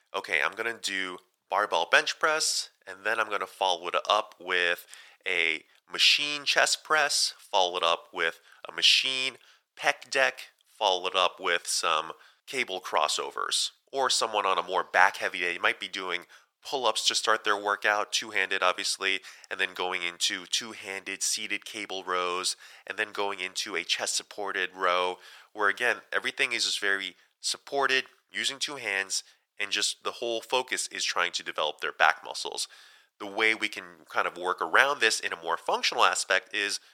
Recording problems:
thin; very; fading below 900 Hz

